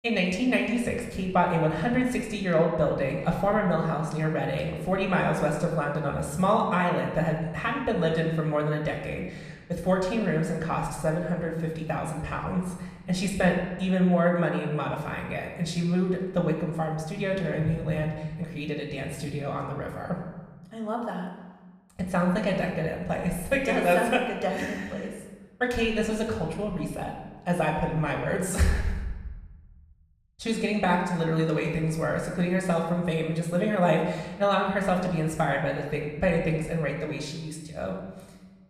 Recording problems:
room echo; noticeable; dies away in 1.1 s
off-mic speech; somewhat distant

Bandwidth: 14.5 kHz